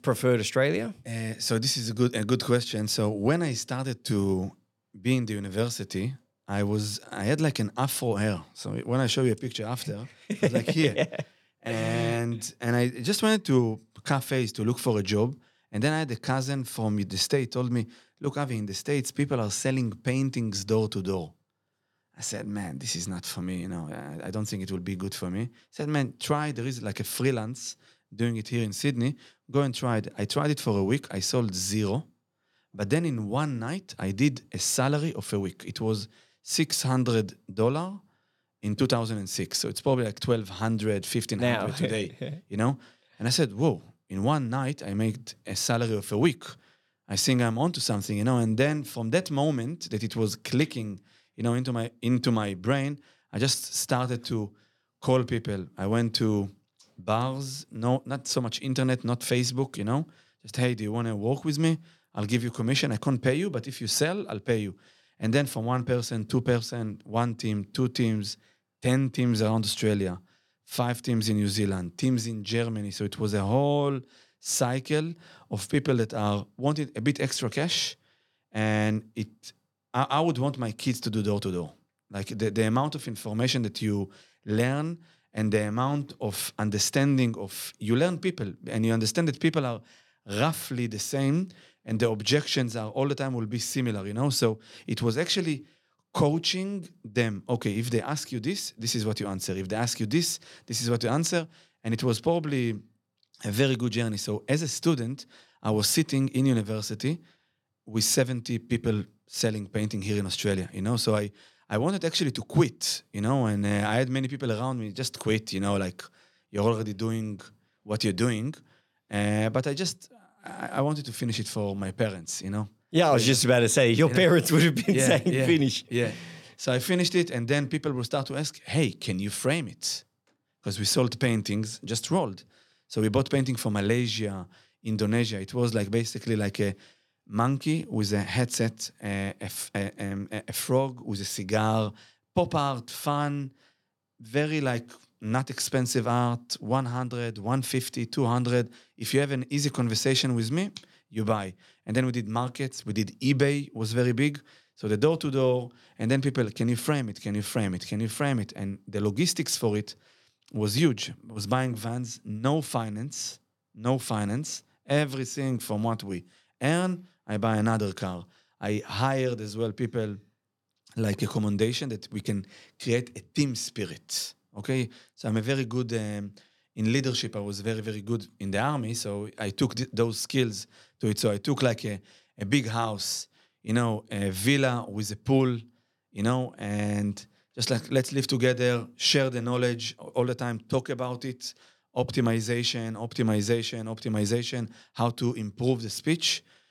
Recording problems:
none

